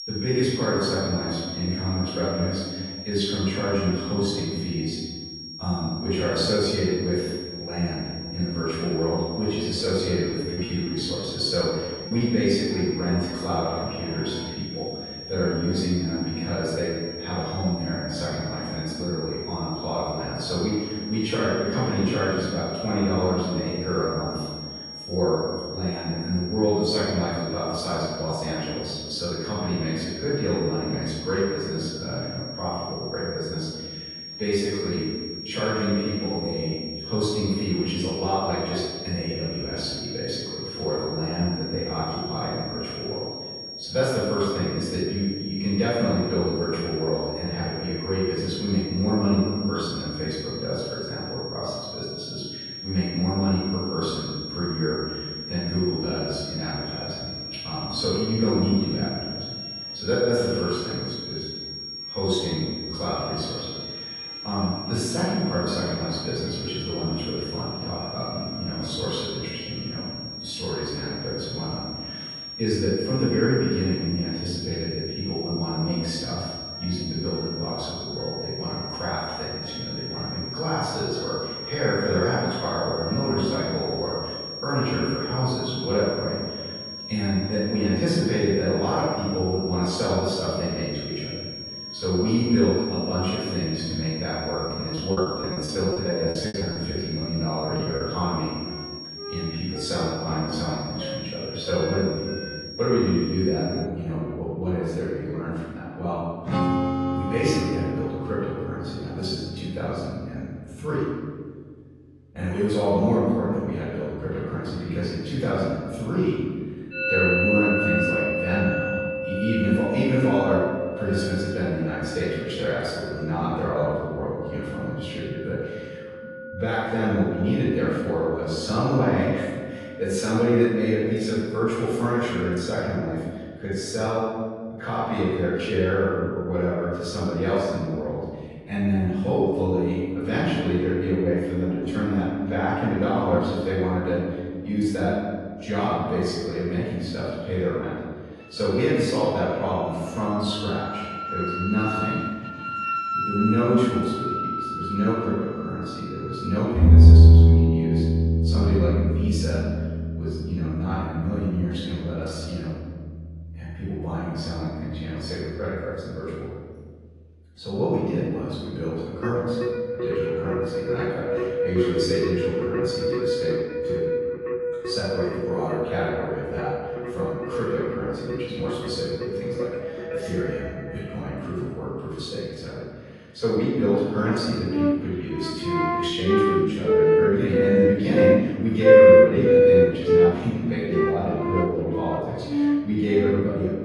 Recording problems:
room echo; strong; dies away in 1.6 s
off-mic speech; far
garbled, watery; slightly
background music; very loud; throughout; 2 dB above the speech
high-pitched whine; loud; until 1:44; 5.5 kHz, 8 dB below the speech
choppy; very; from 10 to 12 s and from 1:35 to 1:38; 16% of the speech affected

